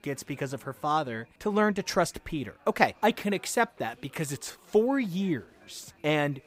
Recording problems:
chatter from many people; faint; throughout; 30 dB below the speech

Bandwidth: 15.5 kHz